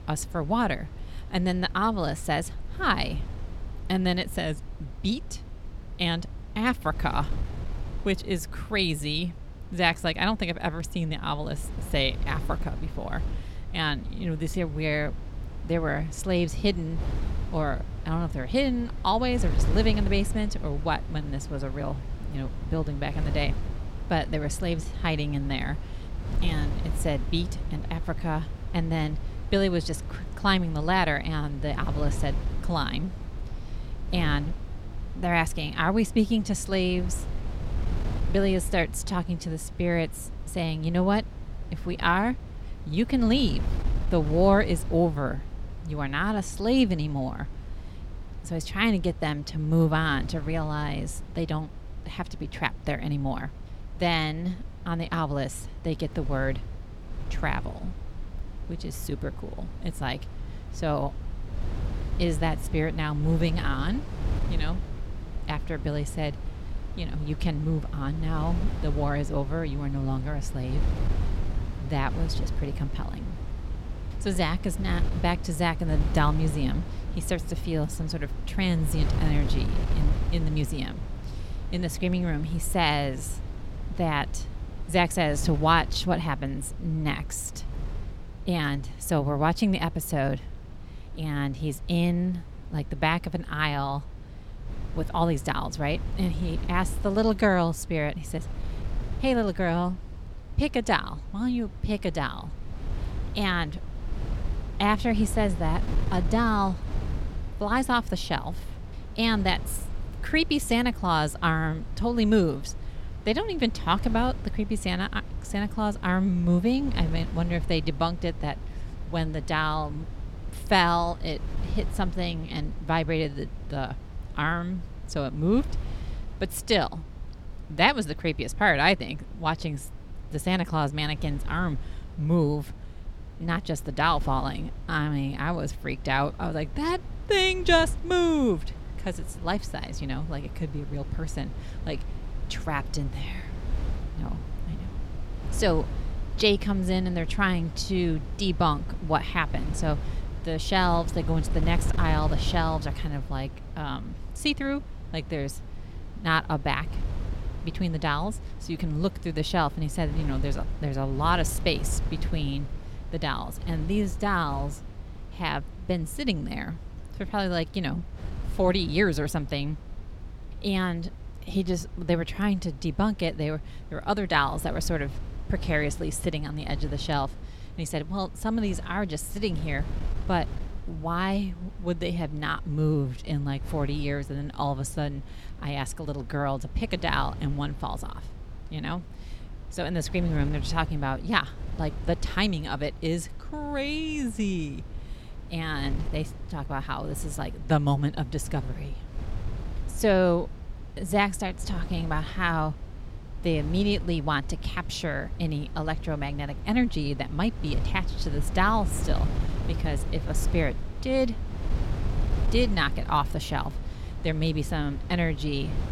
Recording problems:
wind noise on the microphone; occasional gusts; 15 dB below the speech

